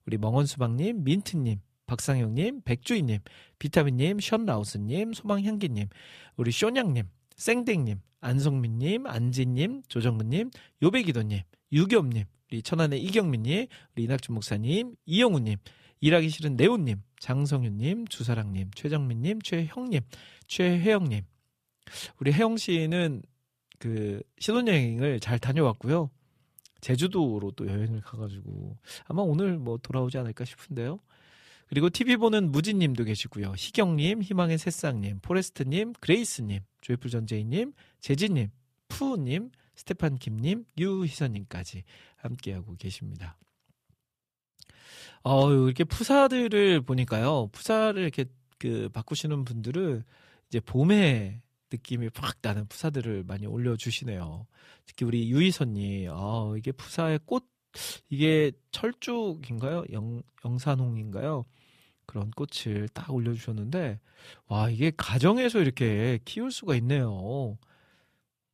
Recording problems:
none

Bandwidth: 14.5 kHz